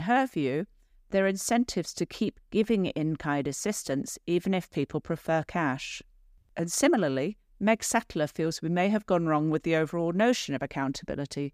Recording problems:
abrupt cut into speech; at the start

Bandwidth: 15 kHz